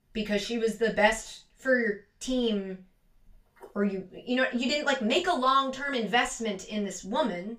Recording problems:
off-mic speech; far
room echo; very slight; dies away in 0.2 s

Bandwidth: 15 kHz